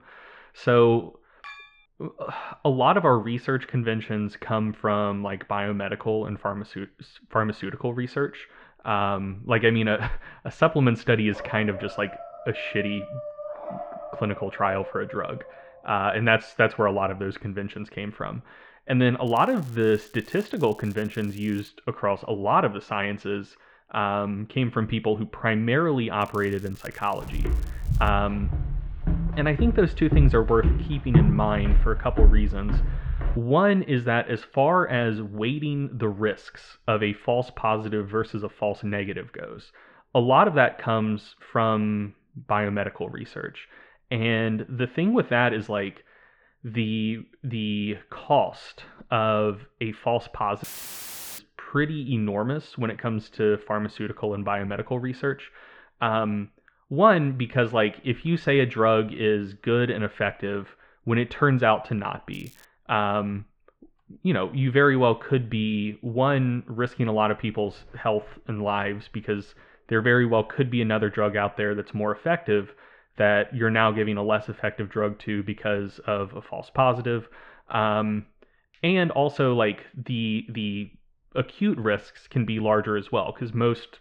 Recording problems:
muffled; very; fading above 2.5 kHz
crackling; faint; from 19 to 22 s, from 26 to 28 s and at 1:02; 25 dB below the speech
clattering dishes; faint; at 1.5 s; peak 15 dB below the speech
dog barking; faint; from 11 to 16 s; peak 10 dB below the speech
footsteps; loud; from 27 to 33 s; peak 5 dB above the speech
audio cutting out; filled with static; at 51 s for 1 s

